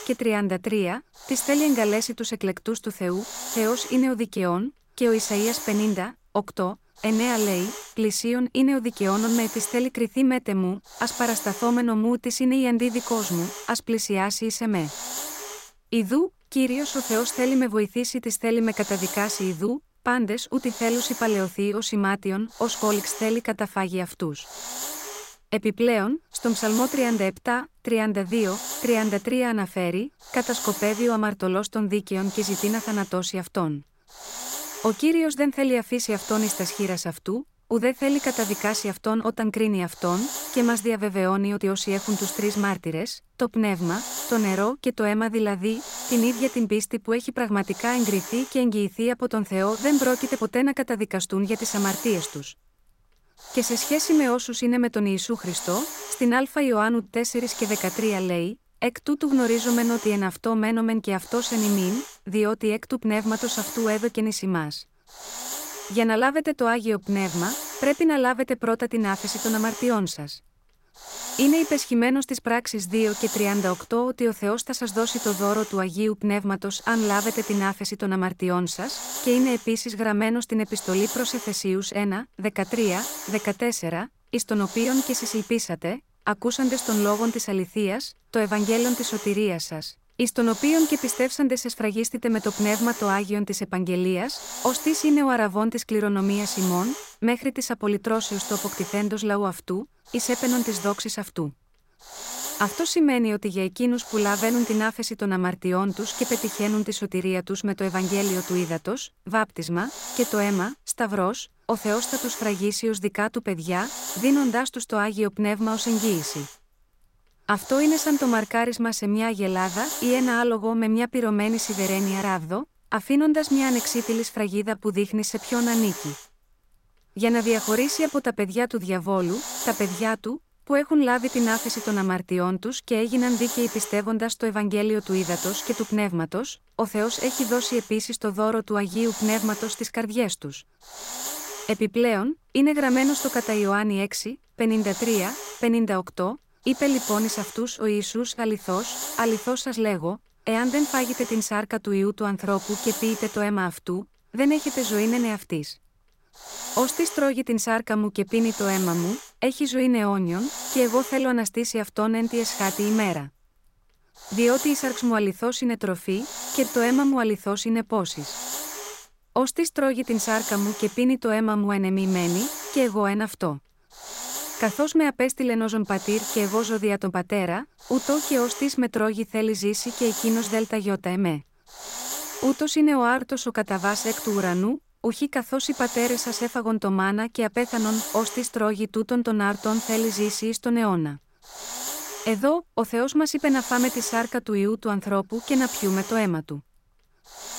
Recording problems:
hiss; loud; throughout; 8 dB below the speech
uneven, jittery; slightly; from 23 s to 3:03

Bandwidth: 16 kHz